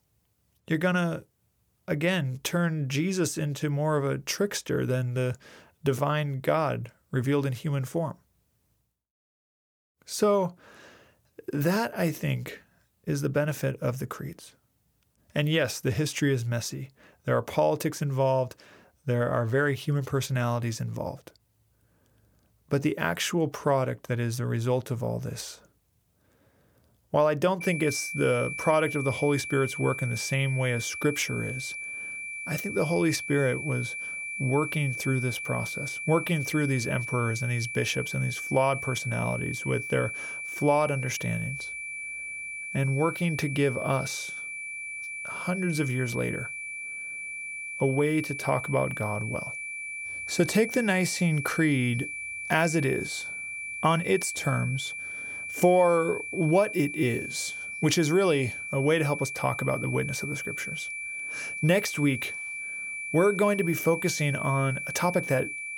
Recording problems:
high-pitched whine; loud; from 28 s on; 2.5 kHz, 6 dB below the speech

